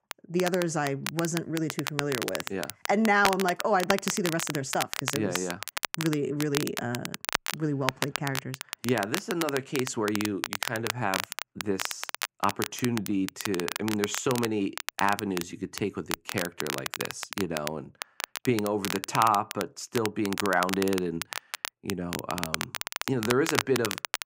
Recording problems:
crackle, like an old record; loud; 4 dB below the speech

